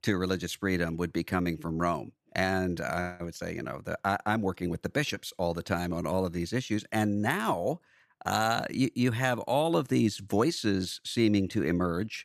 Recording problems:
none

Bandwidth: 14.5 kHz